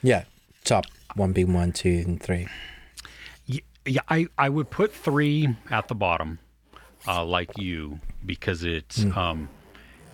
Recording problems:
household noises; faint; throughout; 25 dB below the speech

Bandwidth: 18.5 kHz